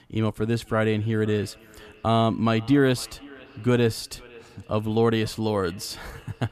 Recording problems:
echo of what is said; faint; throughout; 510 ms later, 25 dB below the speech

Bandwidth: 14.5 kHz